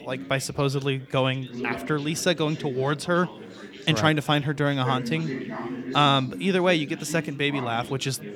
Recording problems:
chatter from many people; noticeable; throughout; 10 dB below the speech

